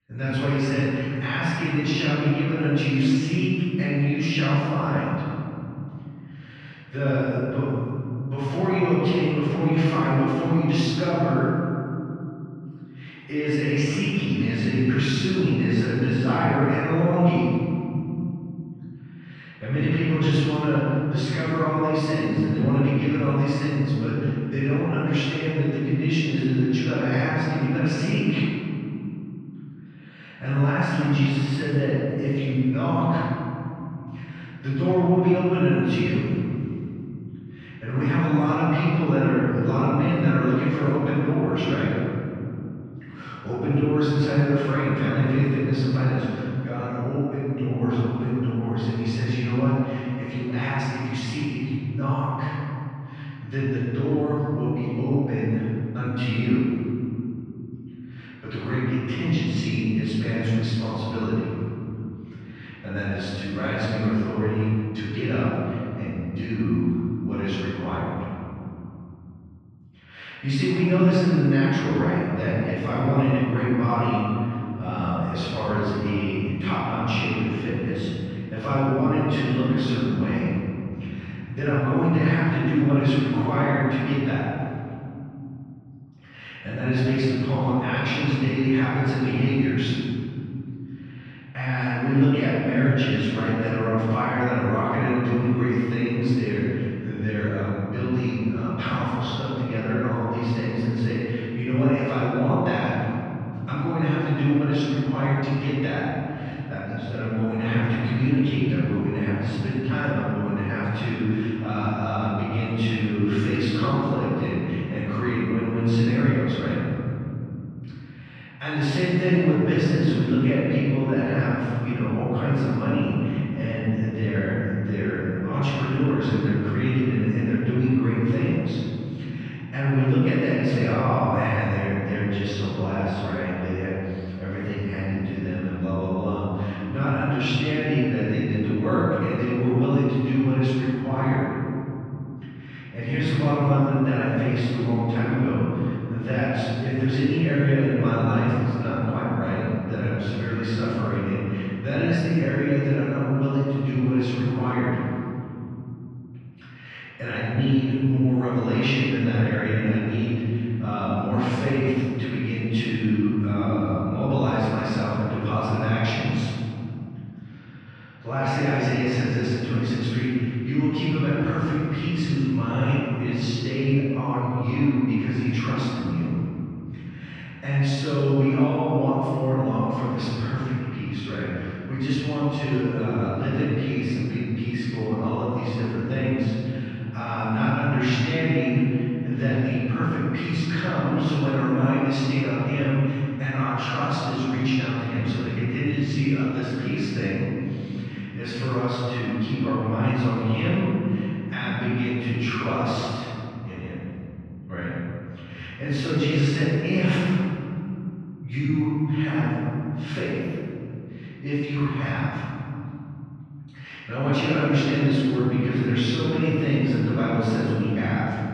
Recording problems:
room echo; strong; dies away in 3 s
off-mic speech; far
muffled; slightly; fading above 3 kHz

